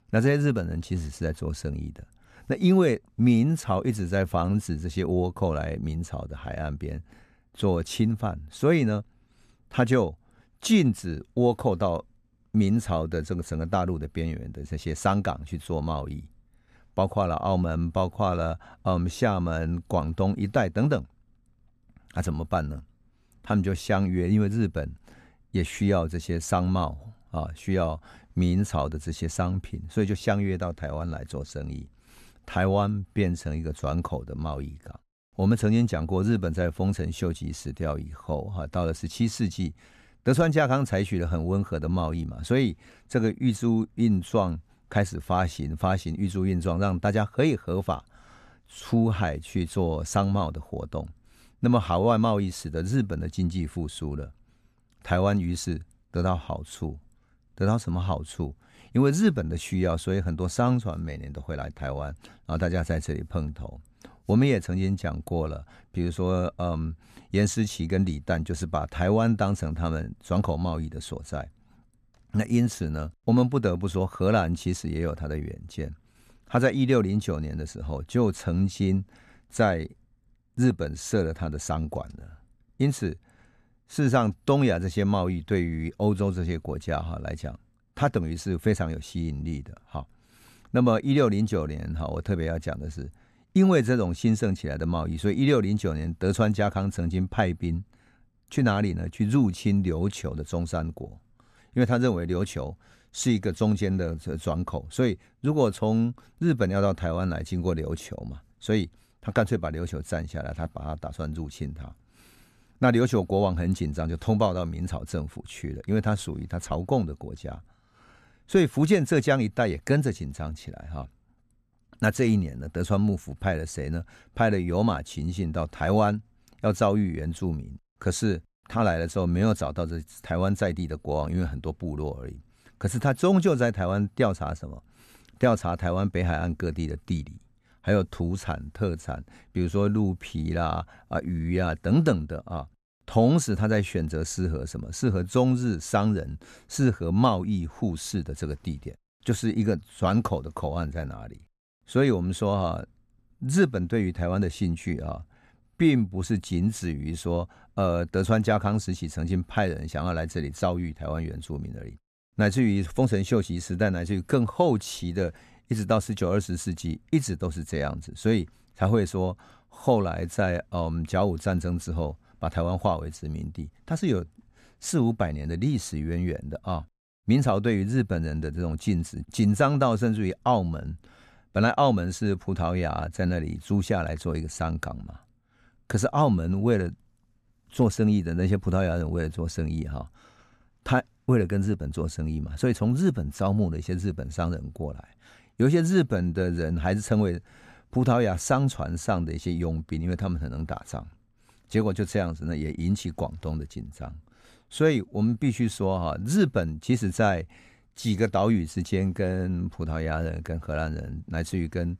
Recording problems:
none

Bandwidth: 14 kHz